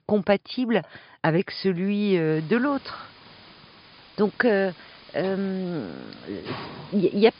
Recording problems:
high frequencies cut off; noticeable; nothing above 5 kHz
hiss; noticeable; from 2.5 s on; 20 dB below the speech

